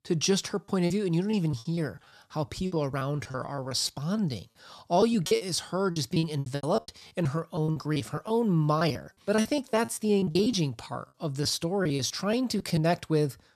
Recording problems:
choppy; very; 14% of the speech affected

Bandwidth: 13.5 kHz